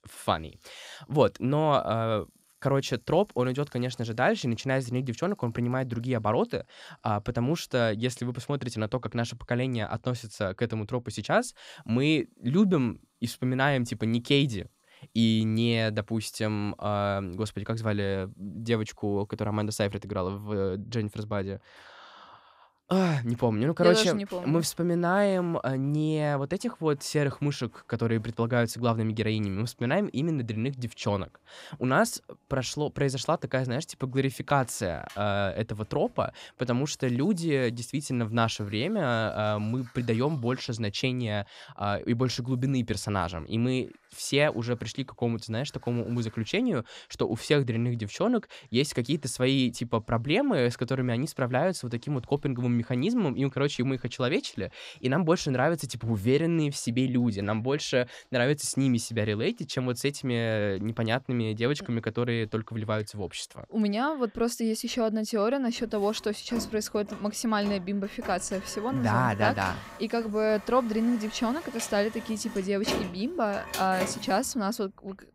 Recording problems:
household noises; noticeable; throughout; 15 dB below the speech

